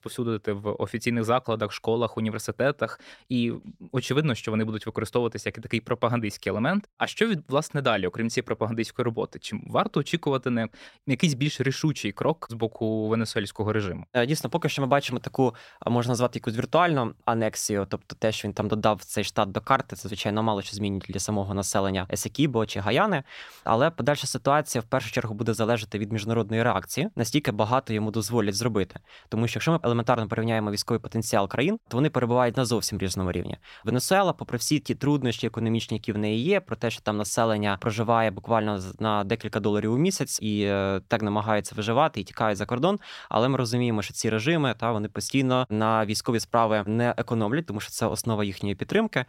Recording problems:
none

